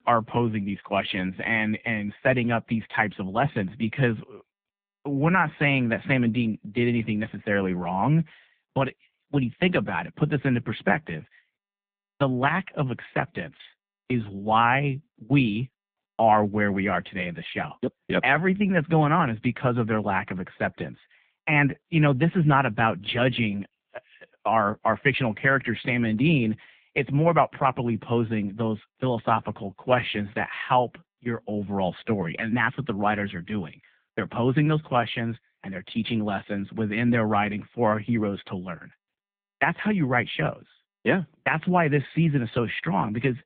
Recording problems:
phone-call audio; poor line

